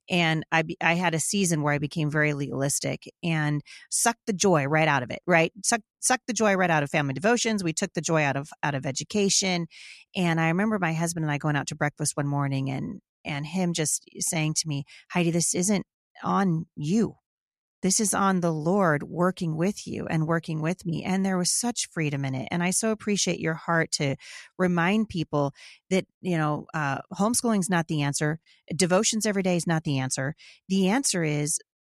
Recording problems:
none

